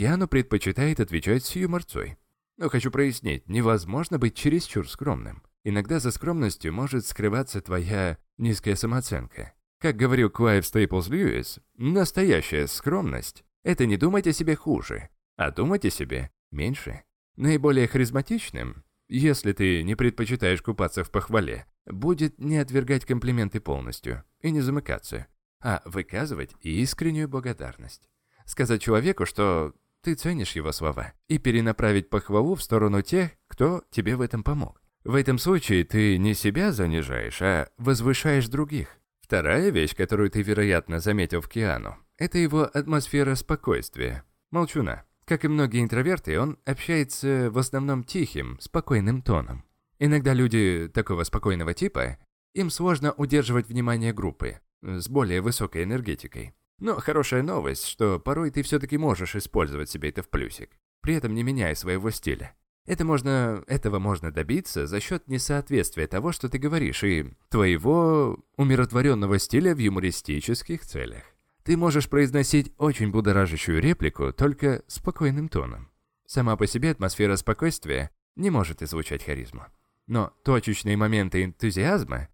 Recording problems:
abrupt cut into speech; at the start

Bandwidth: 17 kHz